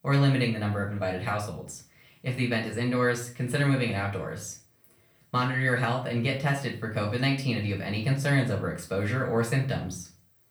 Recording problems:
off-mic speech; far
room echo; slight; dies away in 0.3 s

